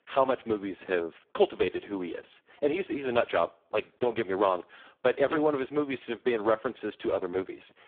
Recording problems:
phone-call audio; poor line

